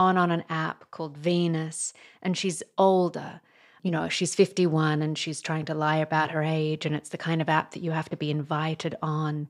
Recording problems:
abrupt cut into speech; at the start

